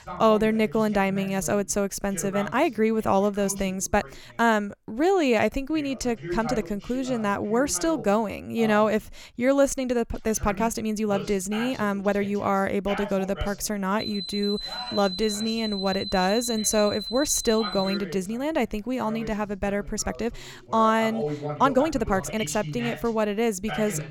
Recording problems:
voice in the background; noticeable; throughout; 15 dB below the speech
uneven, jittery; strongly; from 1 to 22 s
alarm; noticeable; from 14 to 18 s; peak 6 dB below the speech

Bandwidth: 18 kHz